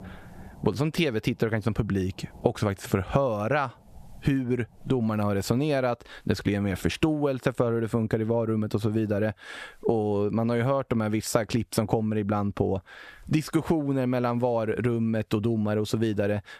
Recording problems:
squashed, flat; somewhat

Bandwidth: 14 kHz